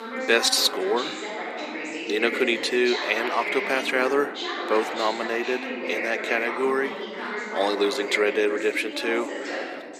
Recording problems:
thin; very; fading below 300 Hz
voice in the background; loud; throughout; 6 dB below the speech

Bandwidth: 14.5 kHz